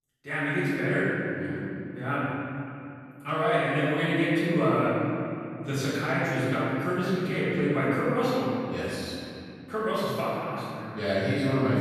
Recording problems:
room echo; strong; dies away in 2.8 s
off-mic speech; far

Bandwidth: 13.5 kHz